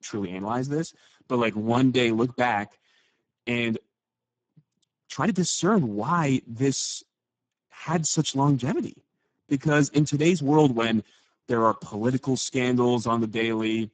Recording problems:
garbled, watery; badly; nothing above 7.5 kHz
uneven, jittery; strongly; from 1 to 12 s

